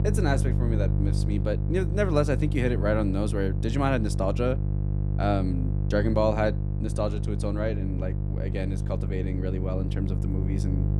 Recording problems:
electrical hum; loud; throughout; 50 Hz, 10 dB below the speech

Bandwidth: 15 kHz